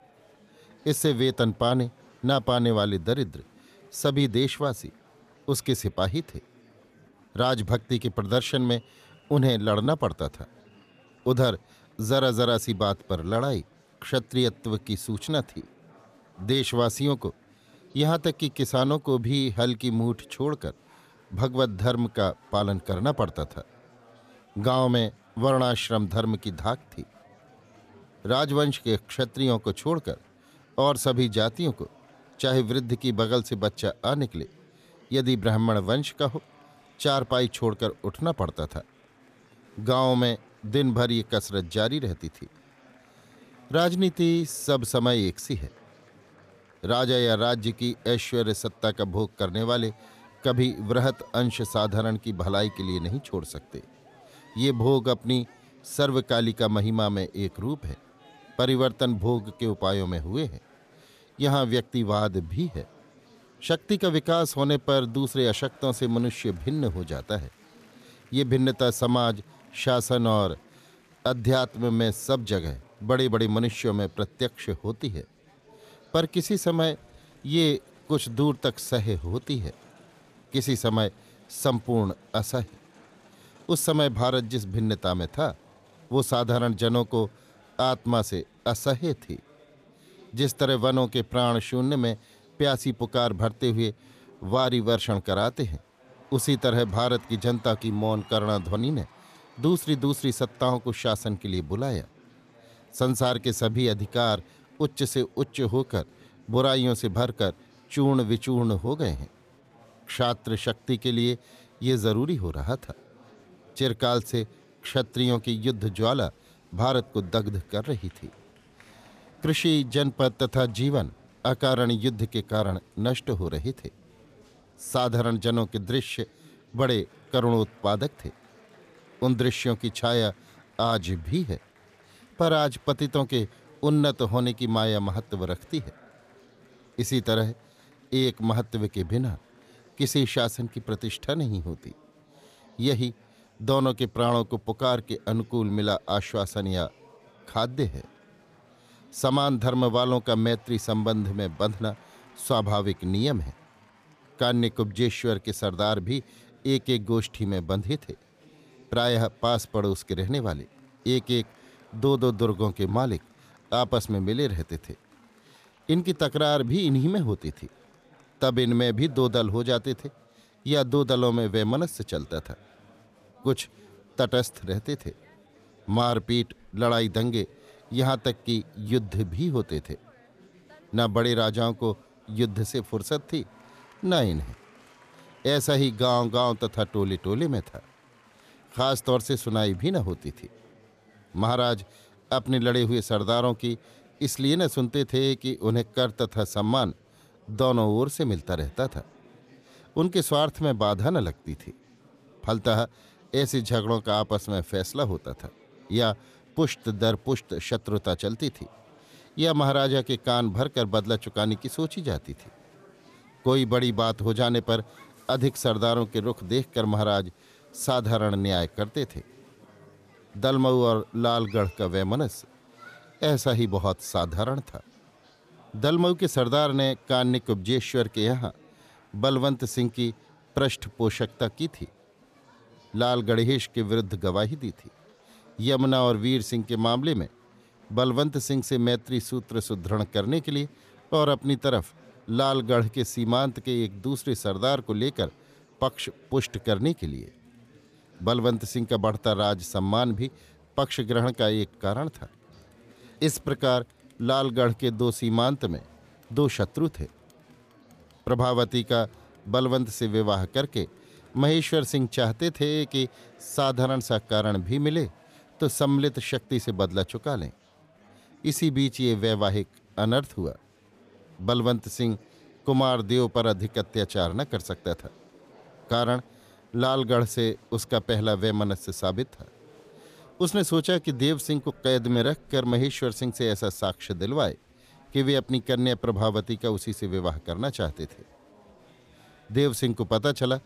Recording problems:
chatter from many people; faint; throughout; 30 dB below the speech

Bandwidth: 14.5 kHz